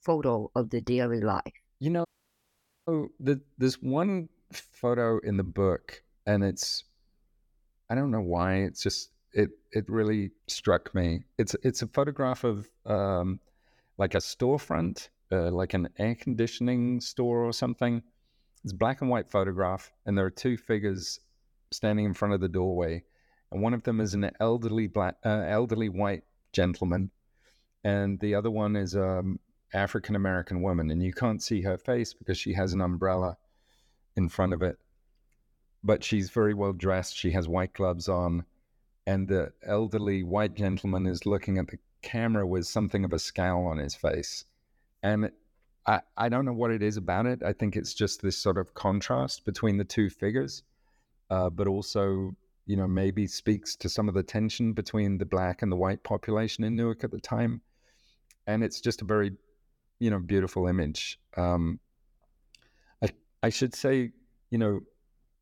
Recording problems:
audio cutting out; at 2 s for 1 s

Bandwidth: 17.5 kHz